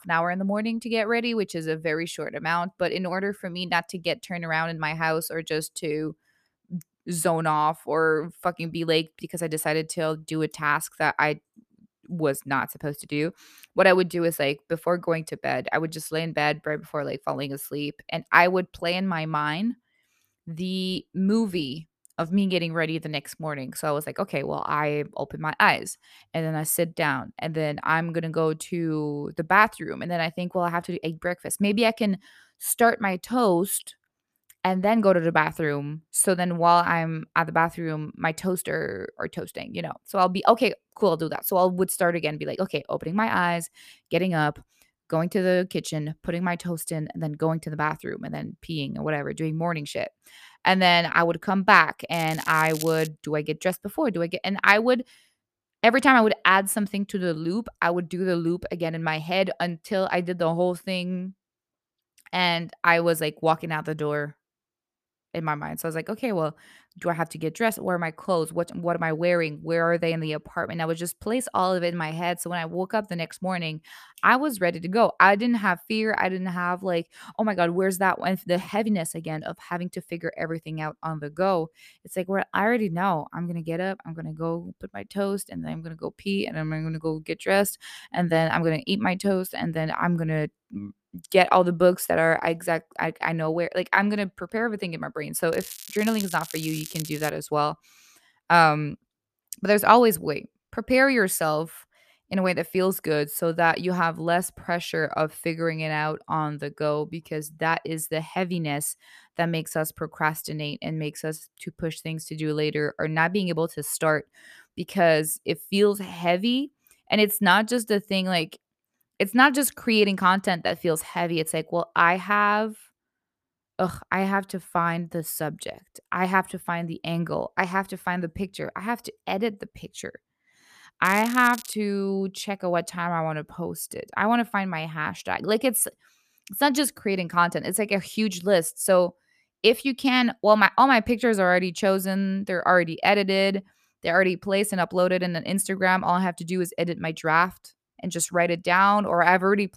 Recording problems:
crackling; noticeable; at 52 s, from 1:36 to 1:37 and at 2:11; 15 dB below the speech

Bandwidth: 14.5 kHz